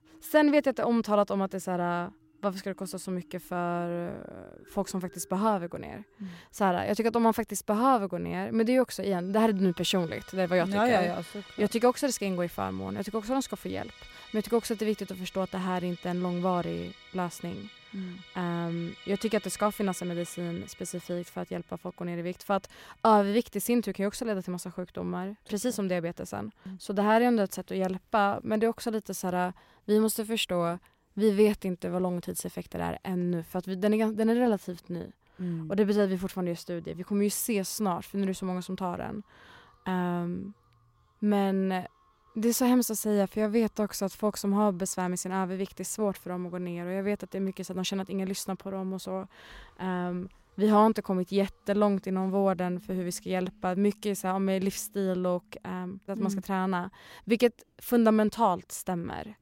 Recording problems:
background music; faint; throughout; 25 dB below the speech

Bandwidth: 16 kHz